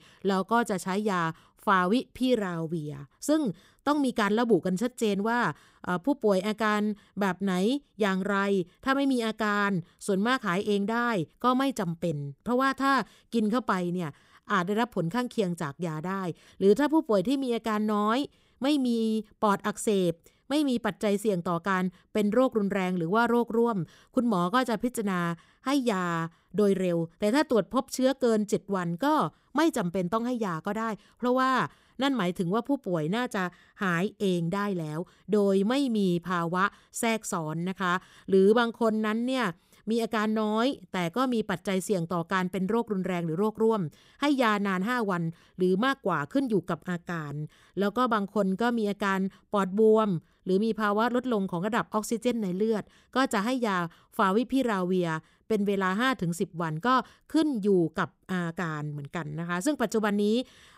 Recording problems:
none

